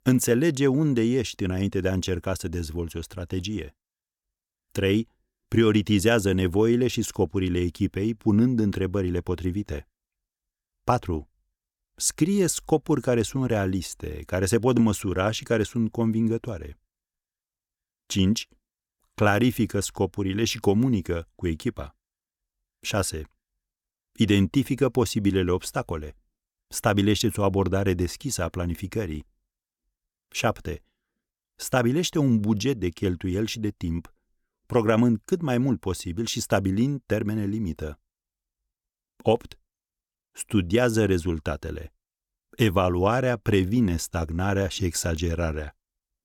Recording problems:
none

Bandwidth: 18 kHz